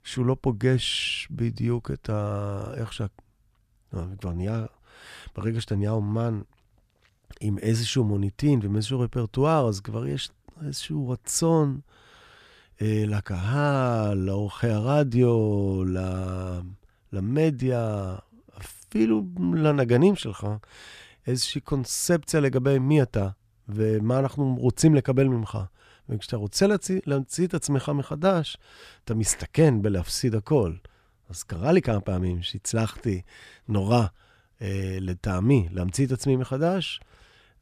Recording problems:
none

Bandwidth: 14.5 kHz